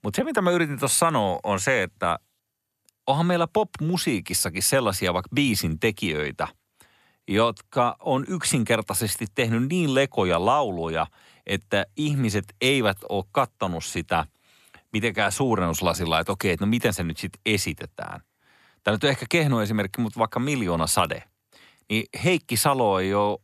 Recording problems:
none

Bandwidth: 13.5 kHz